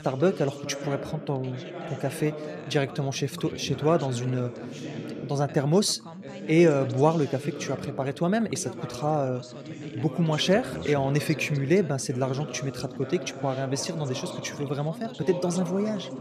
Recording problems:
background chatter; noticeable; throughout; 2 voices, 10 dB below the speech

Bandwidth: 14.5 kHz